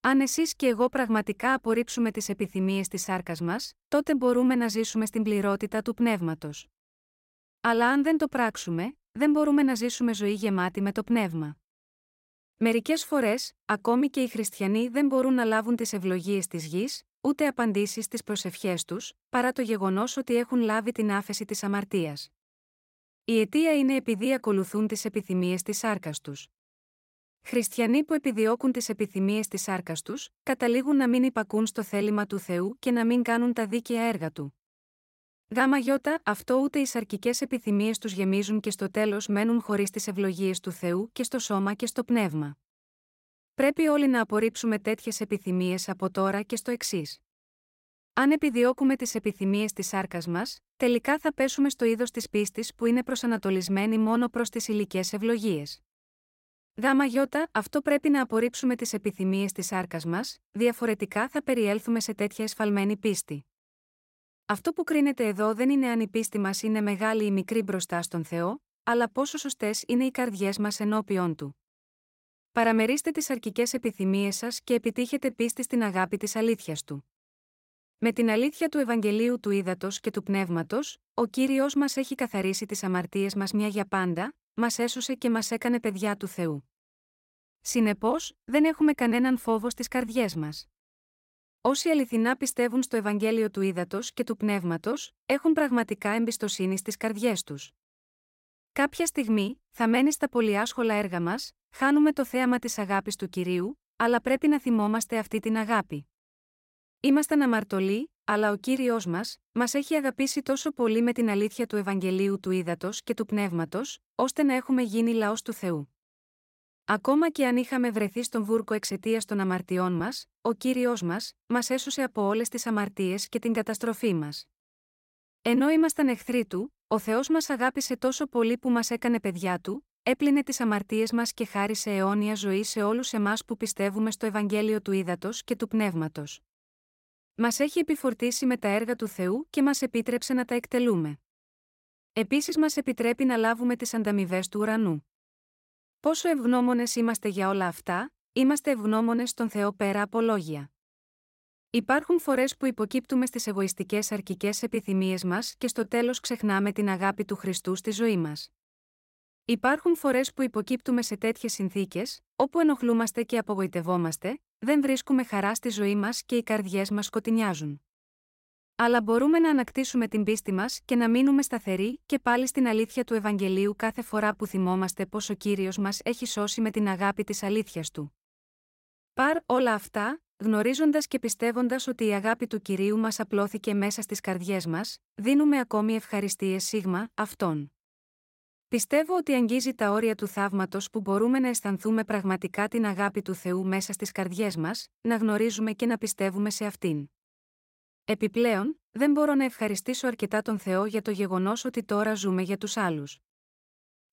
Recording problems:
none

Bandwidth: 16 kHz